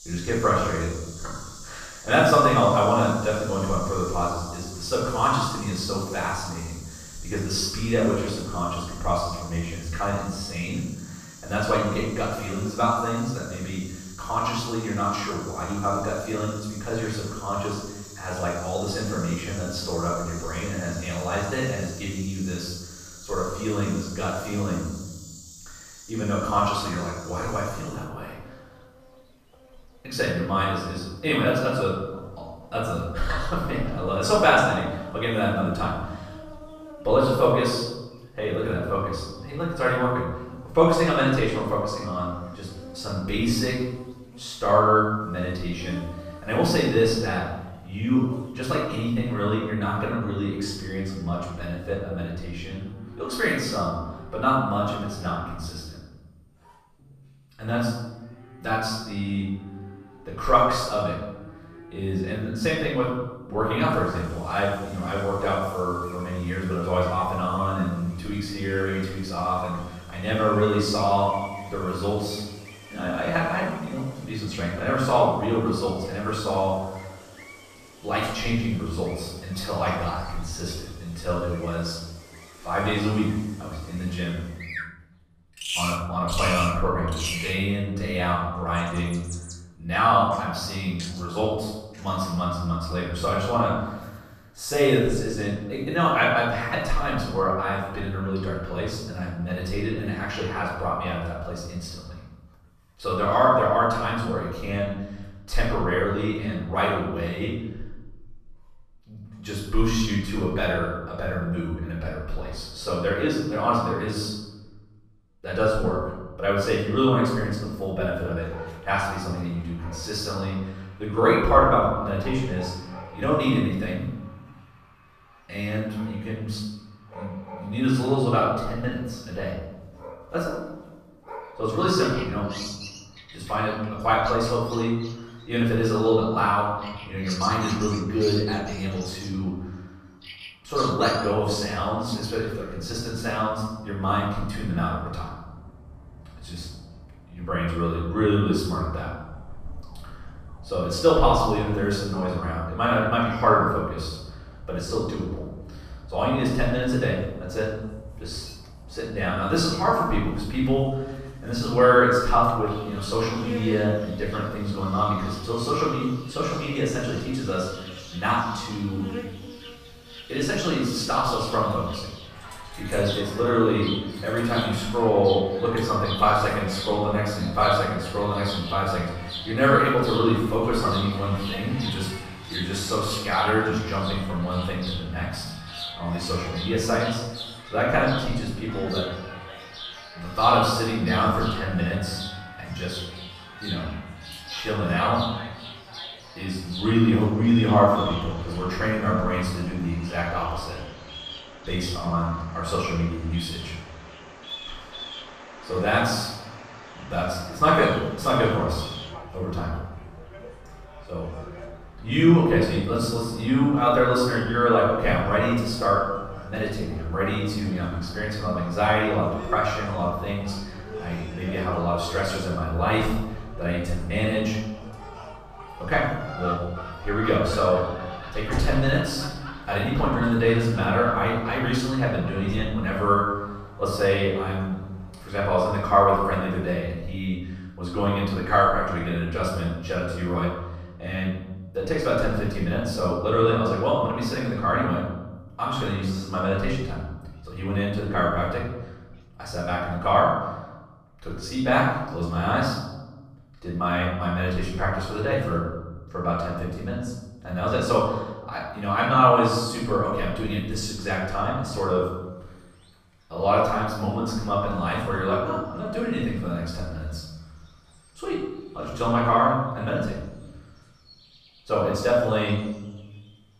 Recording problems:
off-mic speech; far
room echo; noticeable; dies away in 0.9 s
animal sounds; noticeable; throughout; 15 dB below the speech

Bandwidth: 14.5 kHz